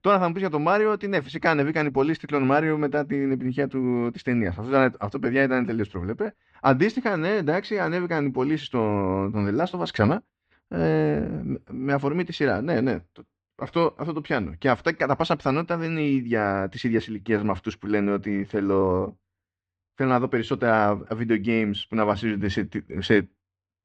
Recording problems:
muffled; slightly; fading above 3.5 kHz

